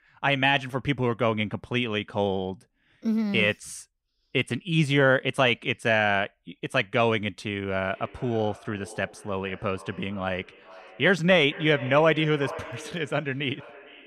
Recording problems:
echo of what is said; noticeable; from 8 s on; 450 ms later, 20 dB below the speech

